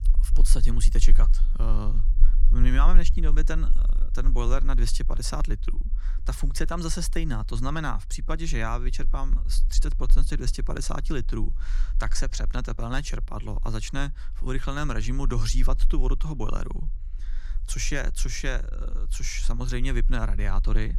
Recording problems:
low rumble; faint; throughout; 20 dB below the speech

